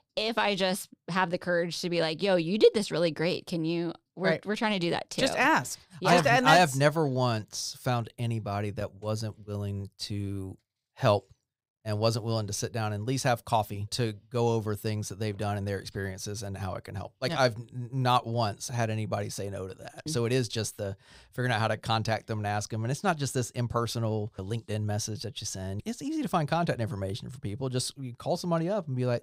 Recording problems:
none

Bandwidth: 15.5 kHz